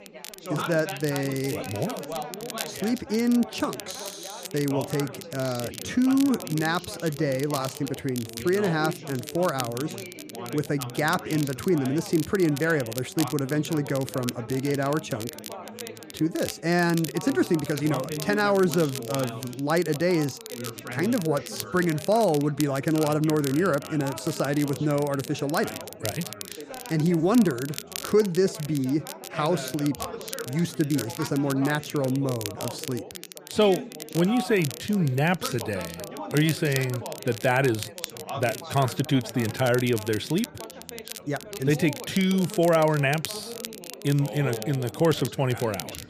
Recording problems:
background chatter; noticeable; throughout; 4 voices, 15 dB below the speech
crackle, like an old record; noticeable; 15 dB below the speech

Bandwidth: 14.5 kHz